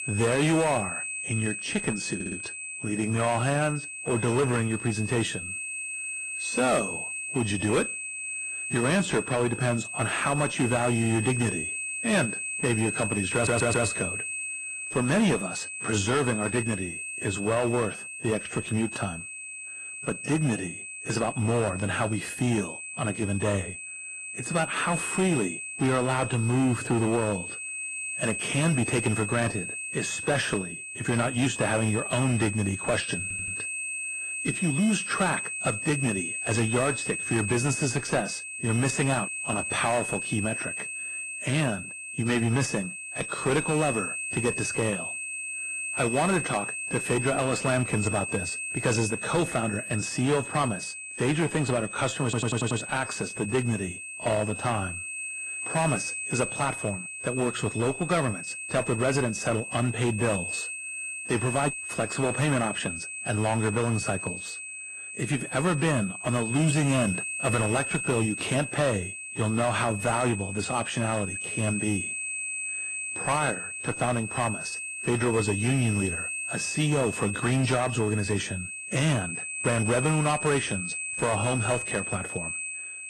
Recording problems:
distortion; slight; 6% of the sound clipped
garbled, watery; slightly
high-pitched whine; loud; throughout; 2.5 kHz, 5 dB below the speech
audio stuttering; 4 times, first at 2 s

